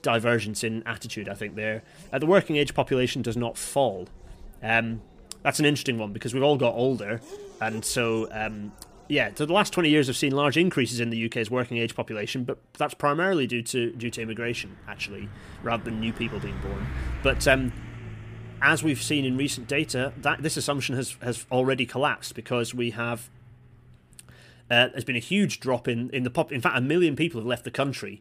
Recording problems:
traffic noise; noticeable; throughout; 15 dB below the speech

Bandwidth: 15 kHz